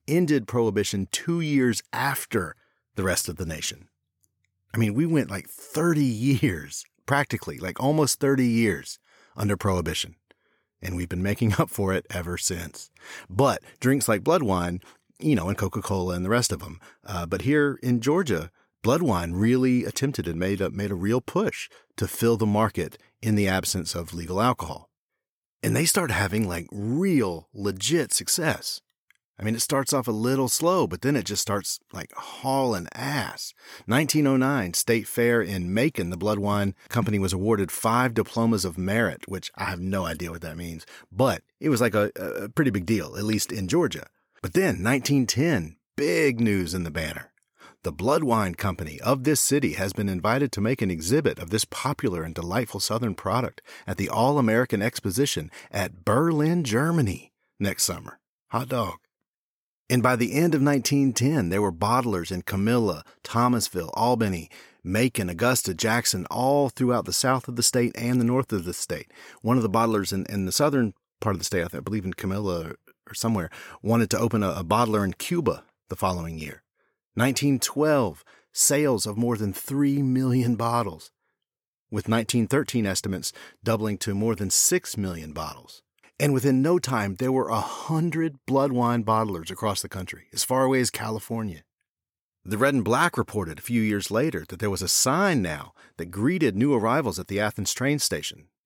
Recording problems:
none

